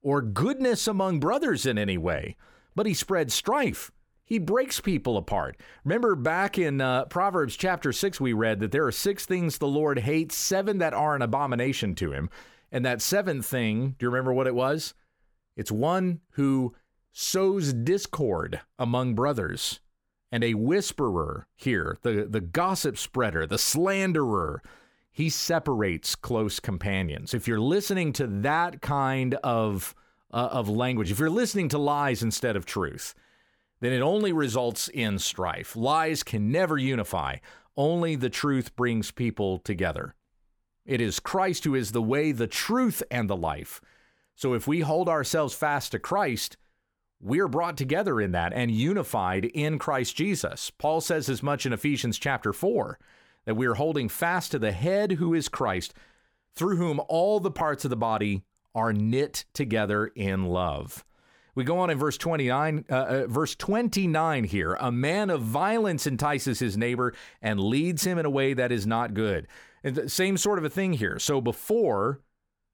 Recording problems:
none

